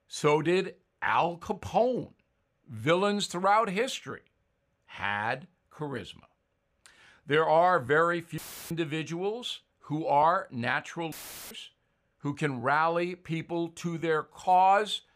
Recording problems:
audio cutting out; filled with static; at 8.5 s and at 11 s

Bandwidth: 15 kHz